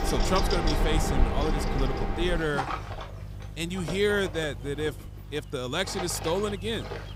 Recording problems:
machinery noise; loud; throughout; 2 dB below the speech
electrical hum; noticeable; throughout; 50 Hz, 15 dB below the speech

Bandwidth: 15.5 kHz